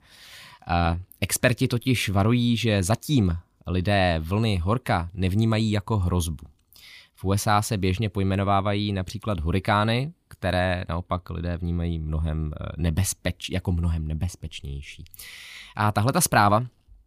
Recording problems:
none

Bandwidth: 15 kHz